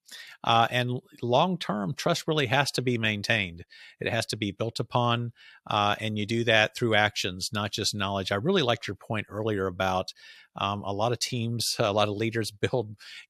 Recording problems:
none

